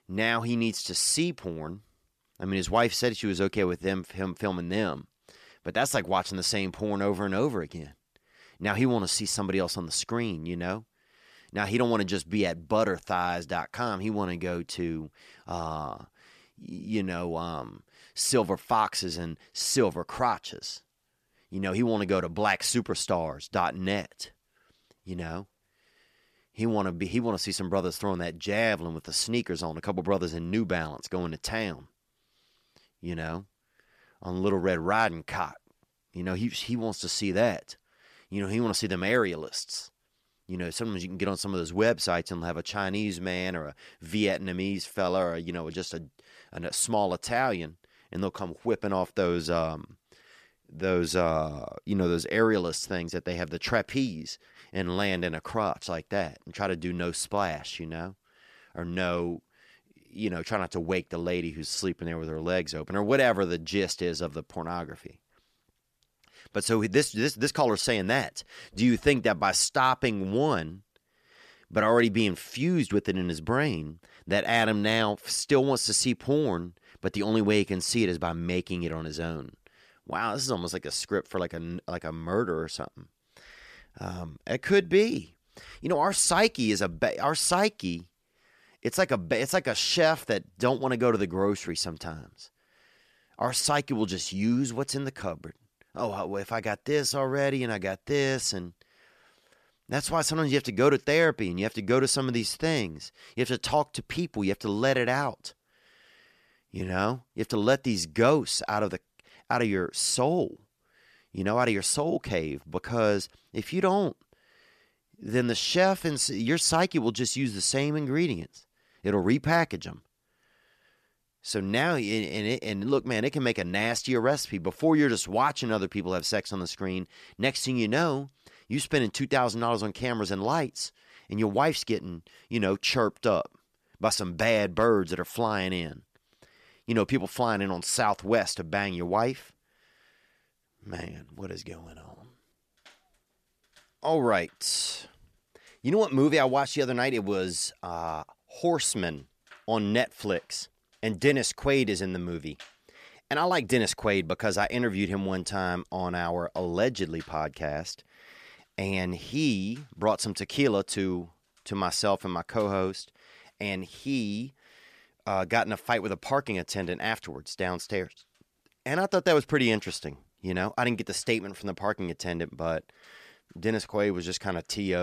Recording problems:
abrupt cut into speech; at the end

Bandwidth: 14.5 kHz